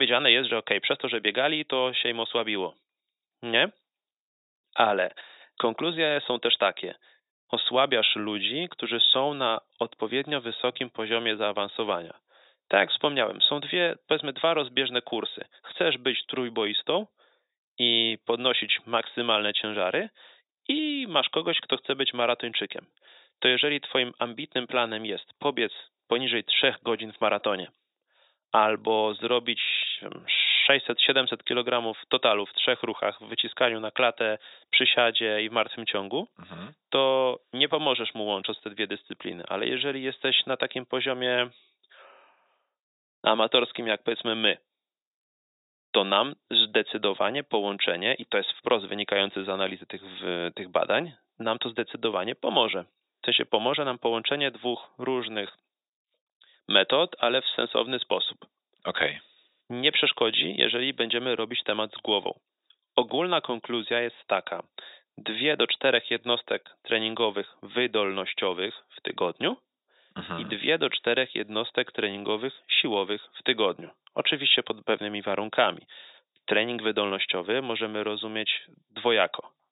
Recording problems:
thin; very; fading below 550 Hz
high frequencies cut off; severe; nothing above 4 kHz
abrupt cut into speech; at the start

